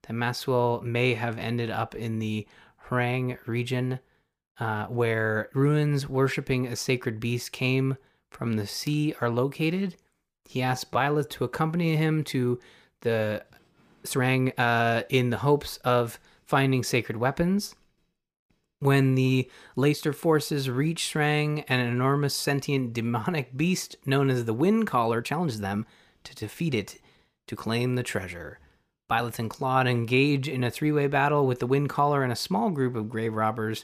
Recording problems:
uneven, jittery; strongly; from 2 to 31 s

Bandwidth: 15 kHz